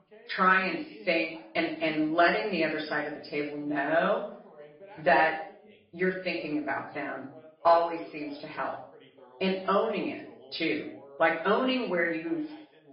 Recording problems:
off-mic speech; far
room echo; noticeable; dies away in 0.5 s
garbled, watery; slightly; nothing above 5 kHz
high frequencies cut off; slight
voice in the background; faint; throughout; 25 dB below the speech

